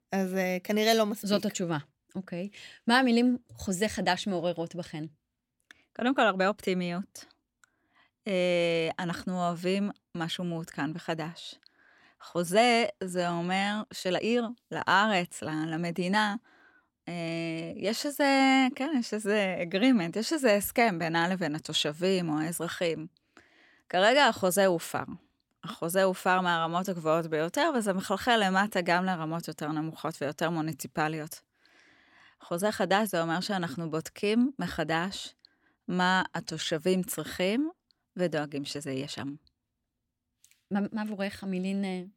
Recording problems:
uneven, jittery; strongly; from 5.5 to 41 s

